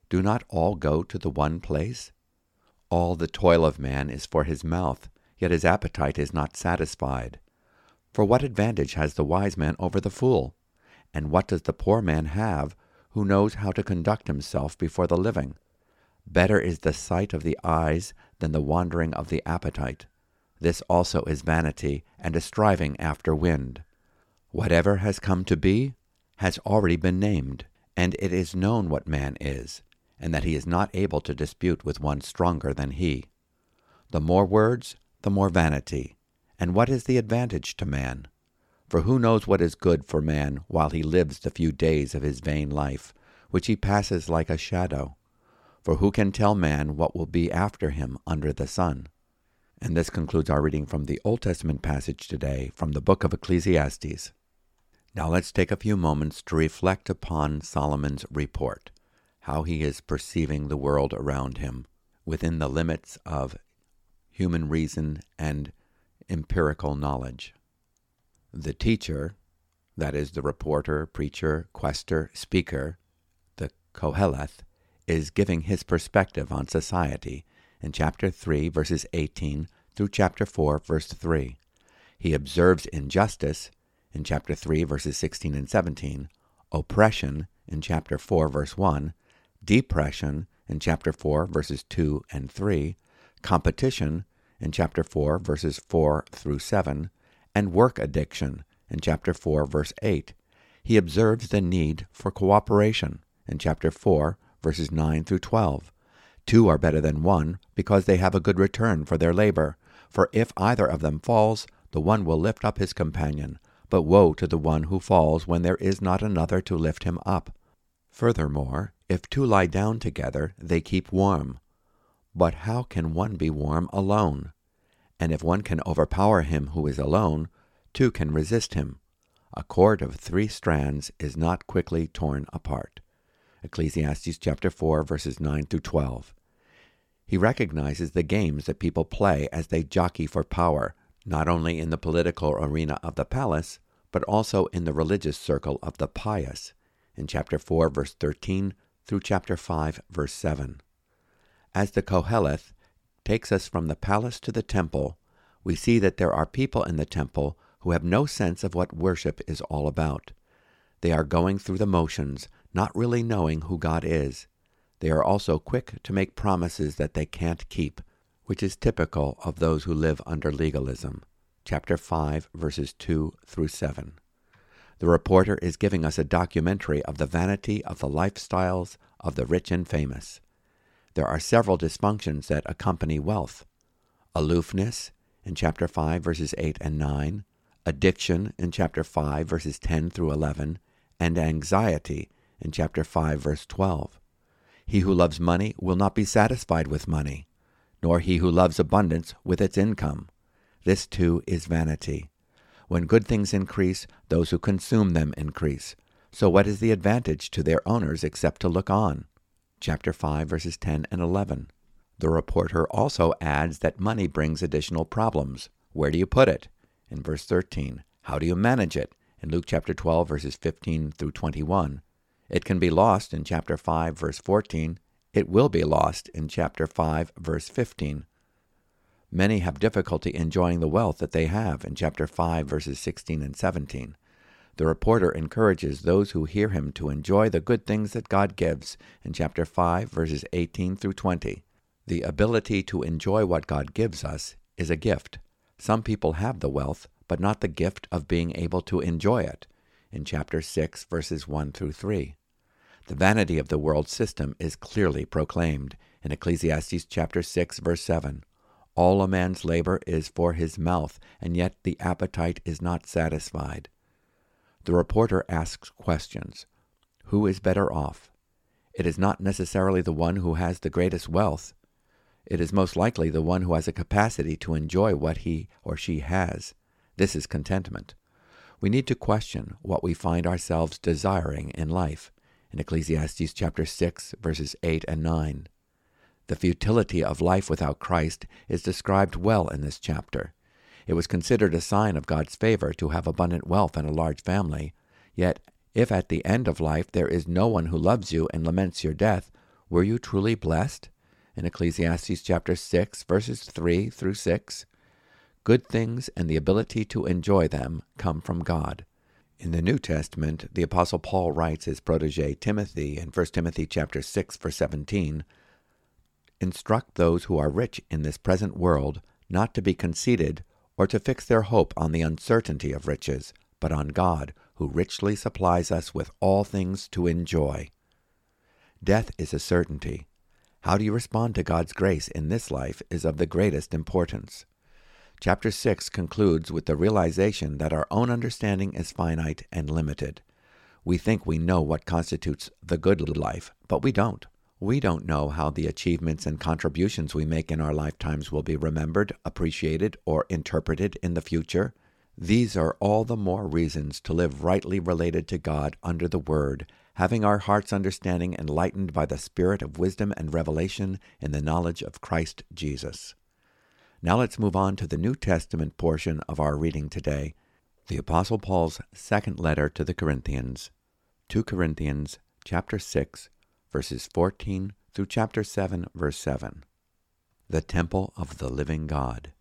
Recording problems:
audio stuttering; at 5:43

